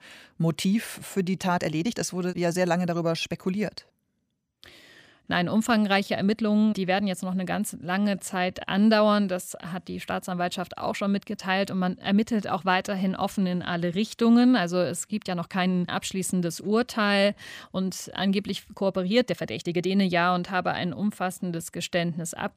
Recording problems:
uneven, jittery; strongly; from 0.5 to 22 s

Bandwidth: 15 kHz